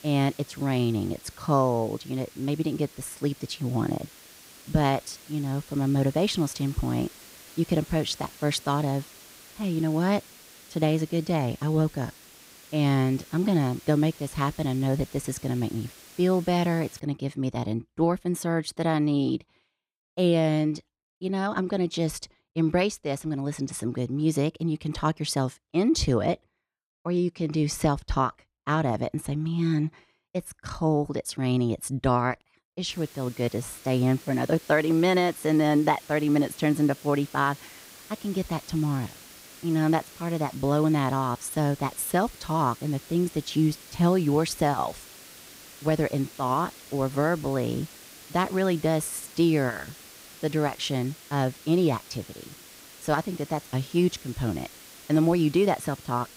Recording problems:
hiss; noticeable; until 17 s and from 33 s on; 20 dB below the speech

